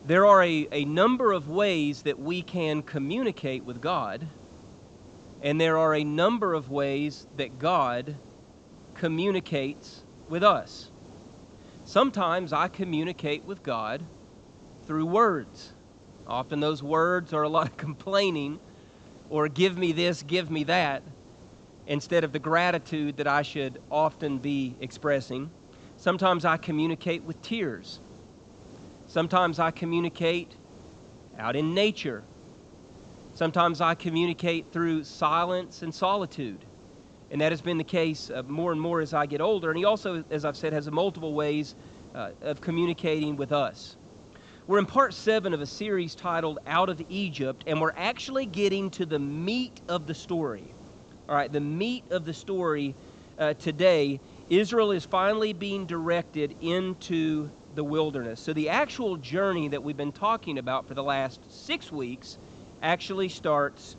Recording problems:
high frequencies cut off; noticeable; nothing above 8 kHz
hiss; faint; throughout; 25 dB below the speech

